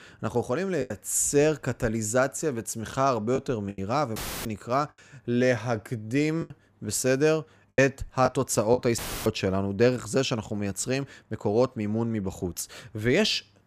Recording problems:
choppy; occasionally; from 1 to 4 s and from 6.5 to 9 s; 5% of the speech affected
audio cutting out; filled with static; at 4 s and at 9 s

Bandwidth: 15 kHz